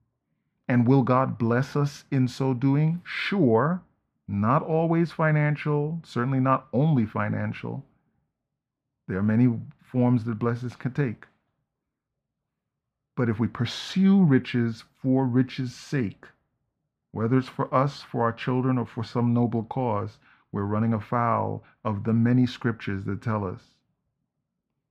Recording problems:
muffled; very; fading above 3 kHz

